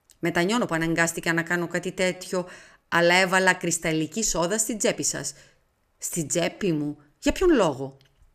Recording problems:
uneven, jittery; strongly; from 0.5 to 8 s

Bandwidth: 14.5 kHz